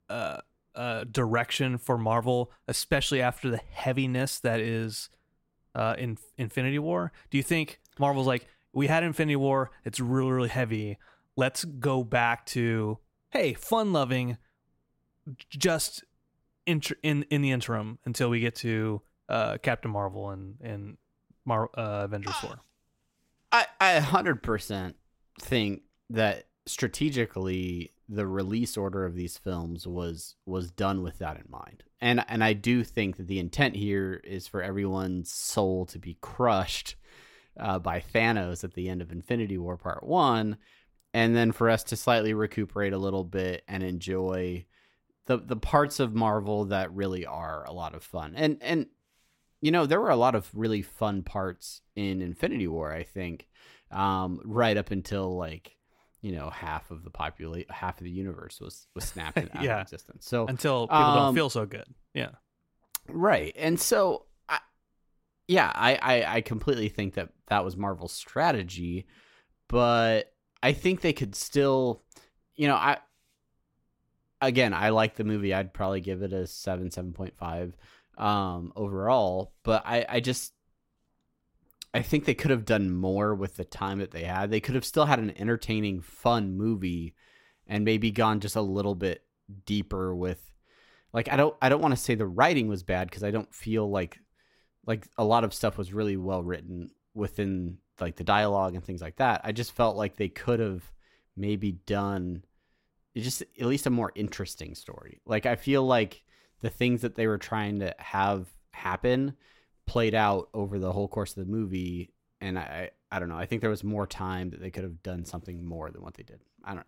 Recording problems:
none

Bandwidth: 16 kHz